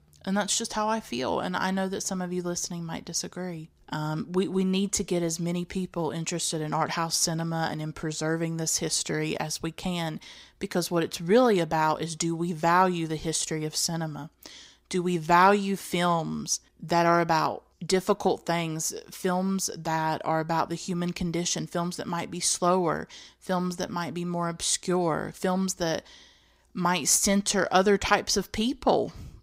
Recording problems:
none

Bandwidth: 15.5 kHz